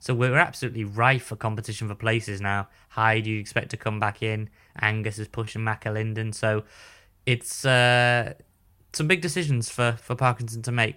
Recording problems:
none

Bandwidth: 16 kHz